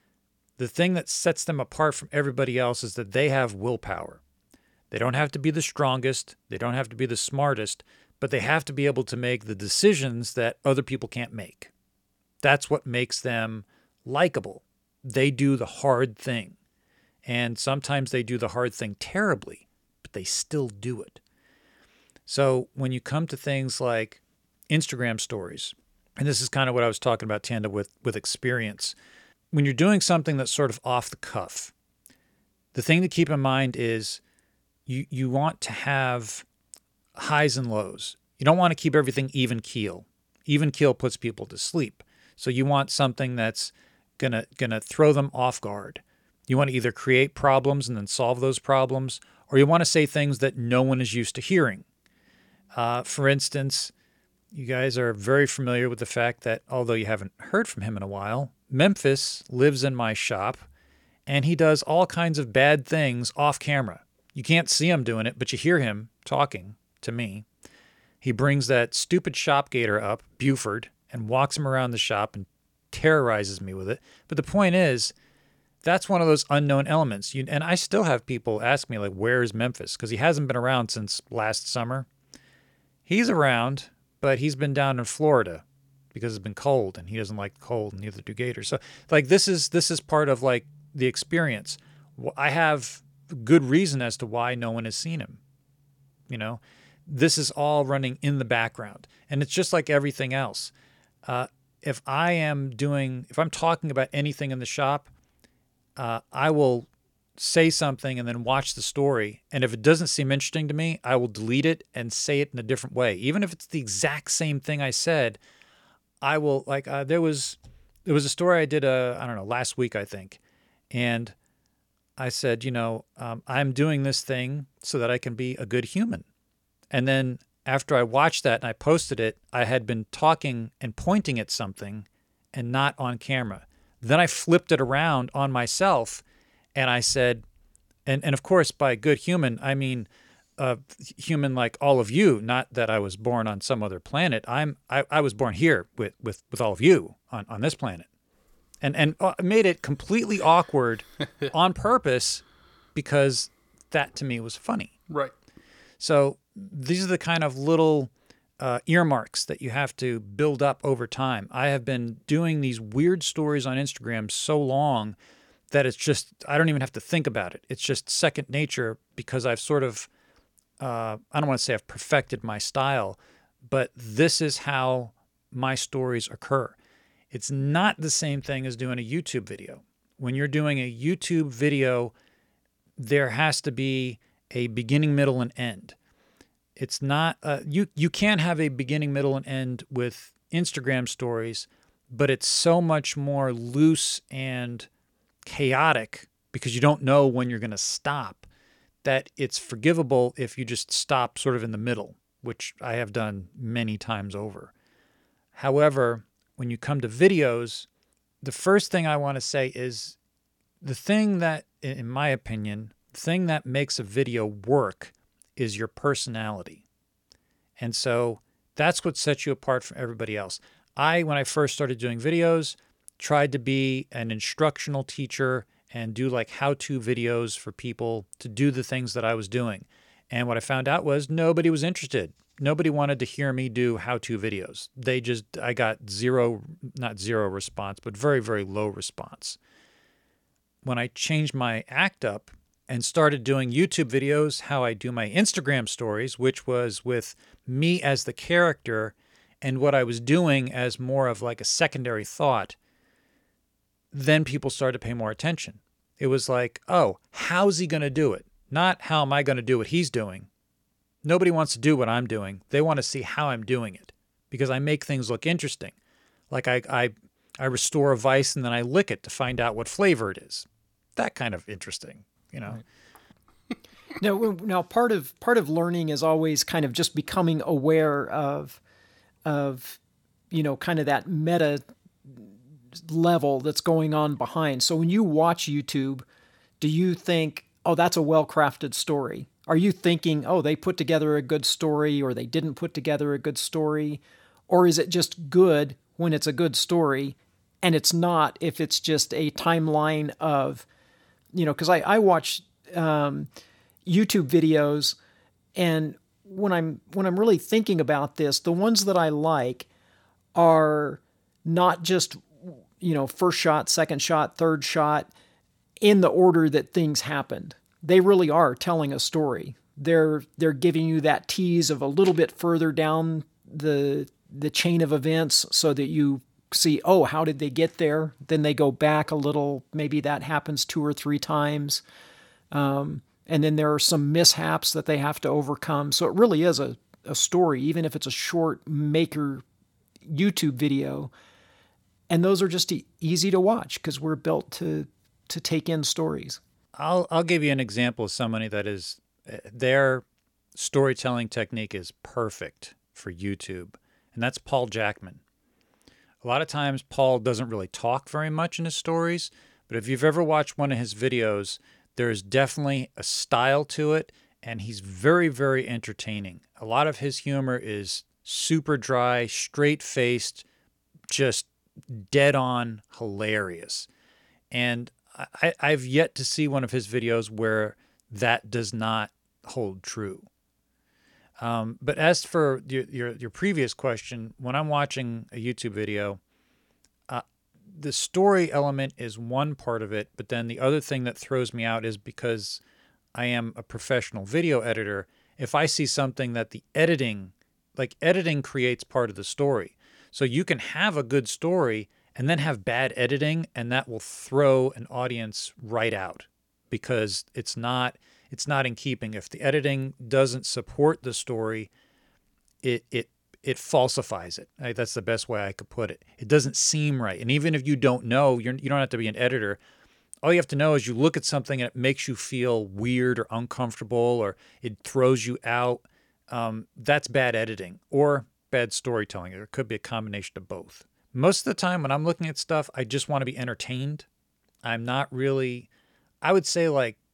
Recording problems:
none

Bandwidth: 17 kHz